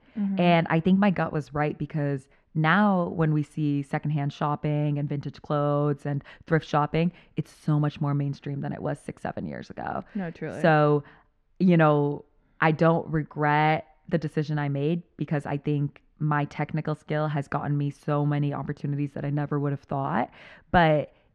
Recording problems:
muffled; very; fading above 2 kHz

